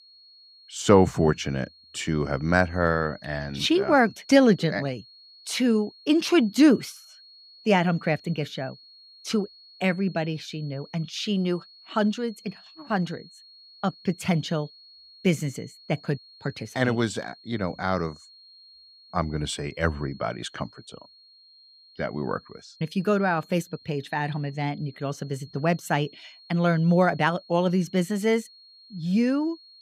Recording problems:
high-pitched whine; faint; throughout; 4.5 kHz, 25 dB below the speech

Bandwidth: 15.5 kHz